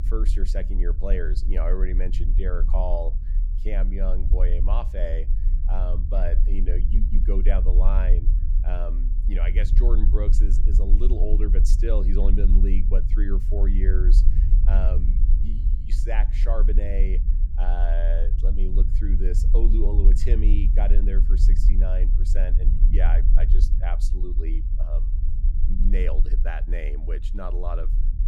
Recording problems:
low rumble; loud; throughout; 9 dB below the speech

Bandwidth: 17.5 kHz